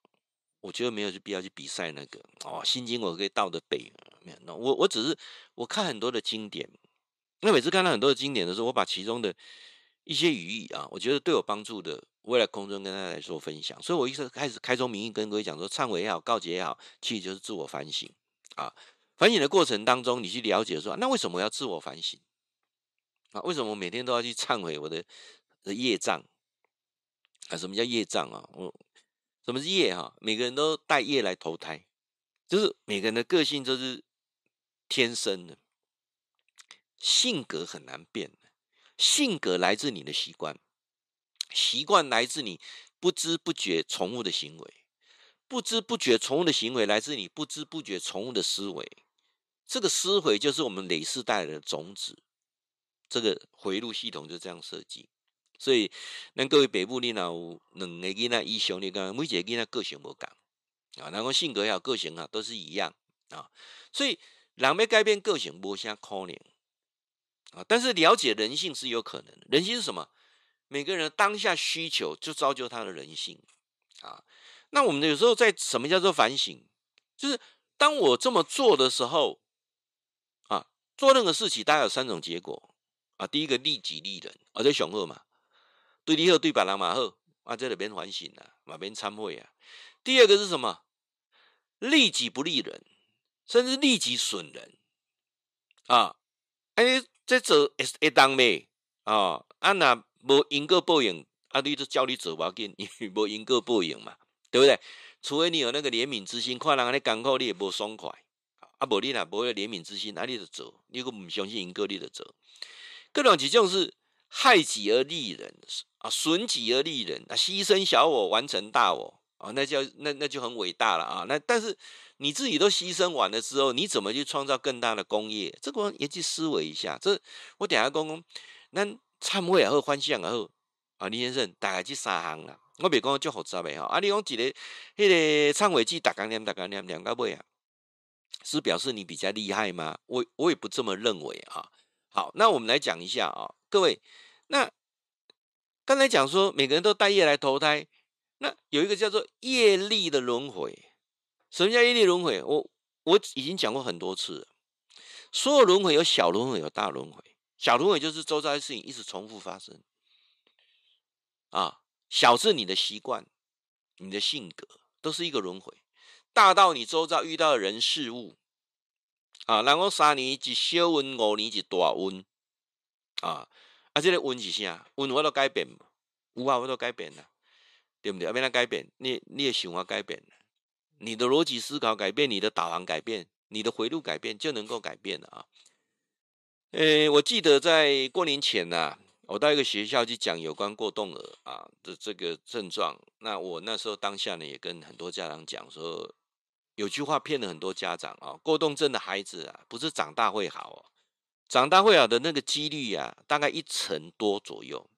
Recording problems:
thin; somewhat; fading below 400 Hz

